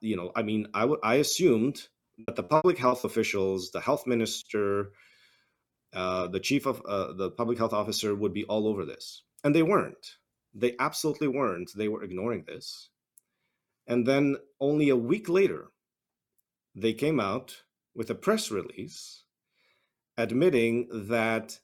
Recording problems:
choppy; very; at 2 s; 23% of the speech affected

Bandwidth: 18.5 kHz